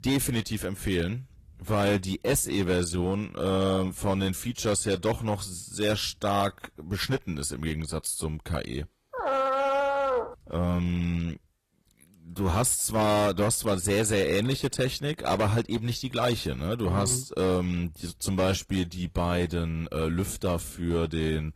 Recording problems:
distortion; slight; 6% of the sound clipped
garbled, watery; slightly
dog barking; loud; from 9 to 10 s; peak 3 dB above the speech

